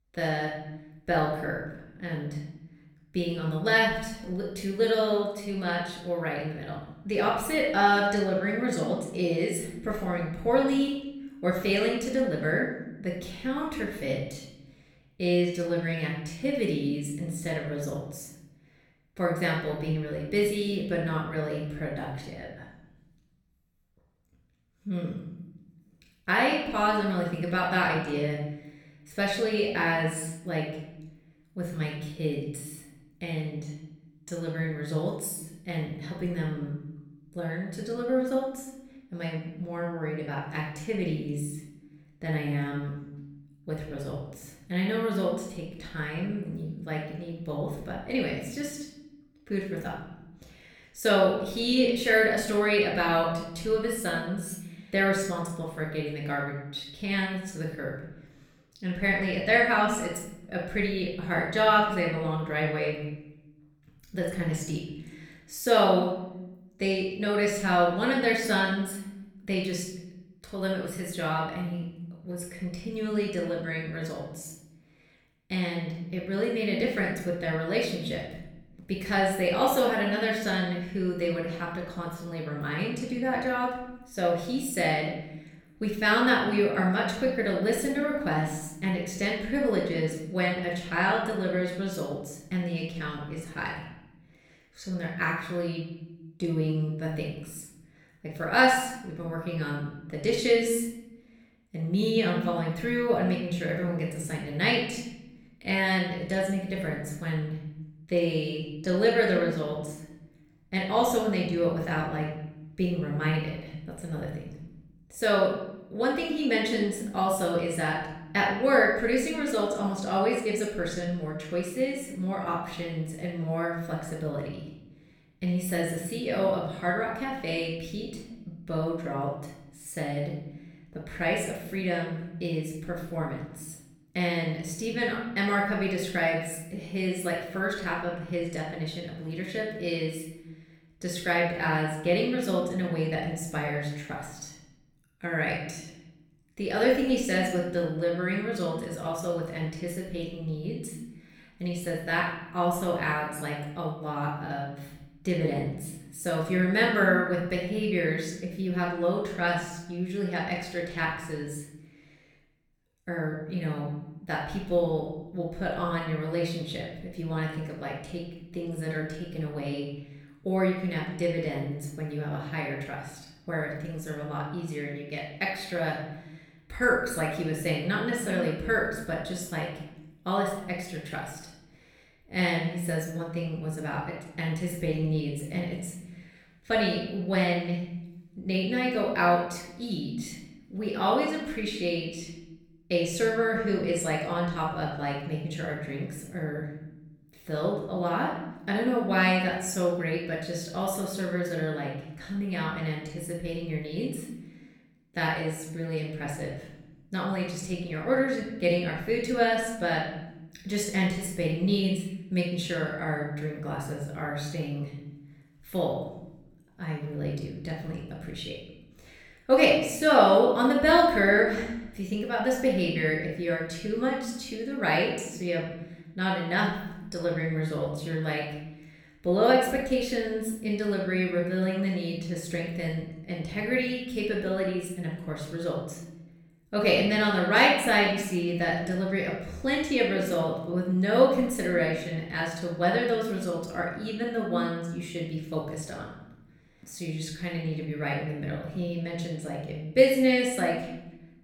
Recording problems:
off-mic speech; far
room echo; noticeable; dies away in 1 s

